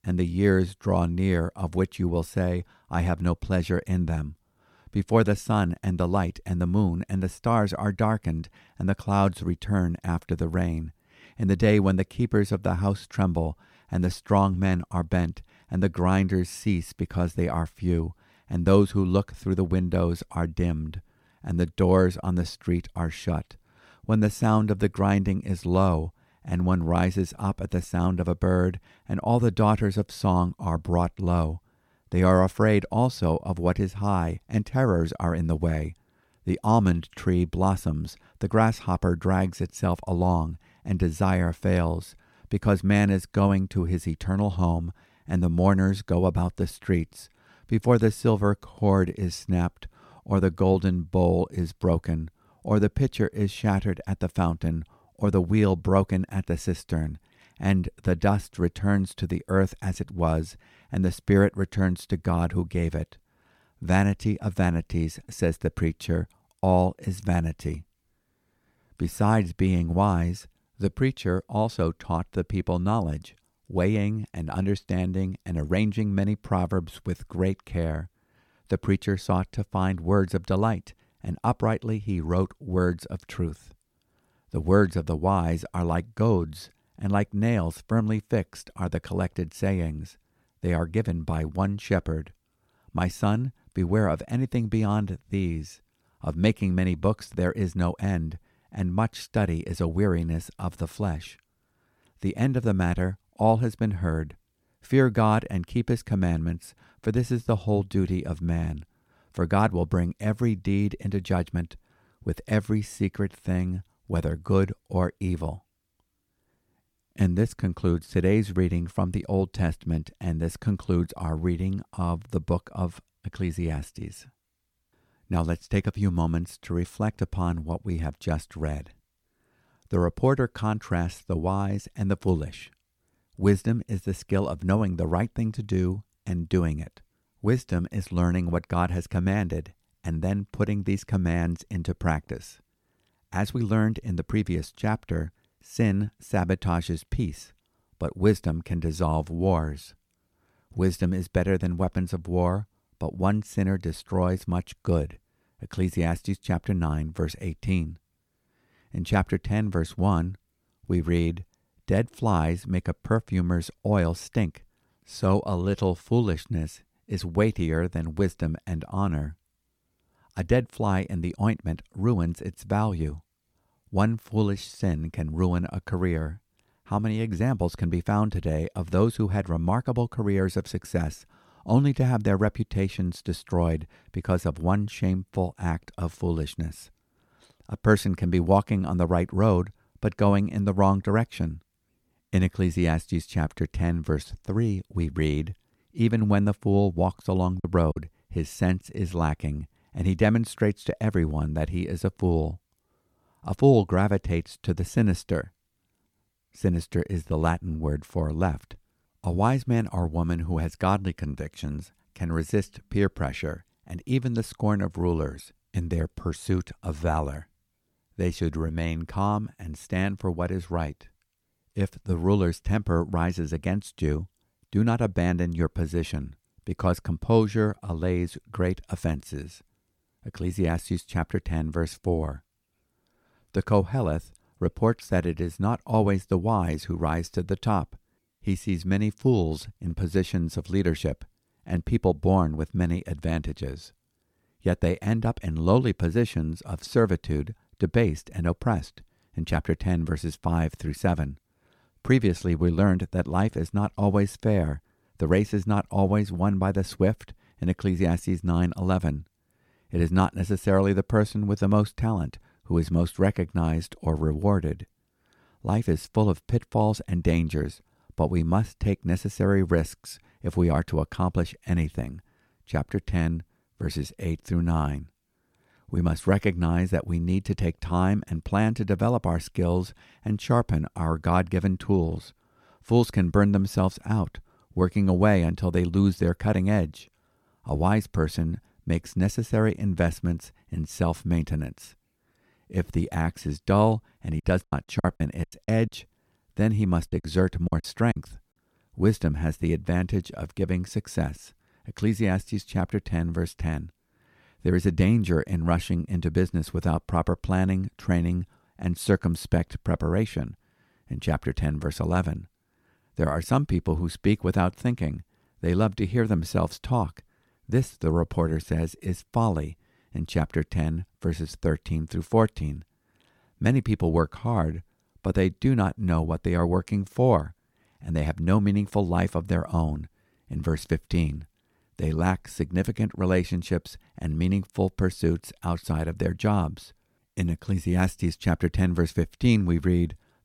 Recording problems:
choppy; very; at 3:18 and from 4:54 to 4:58; 13% of the speech affected

